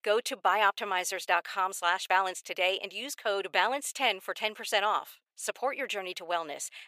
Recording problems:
thin; very; fading below 600 Hz

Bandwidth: 15 kHz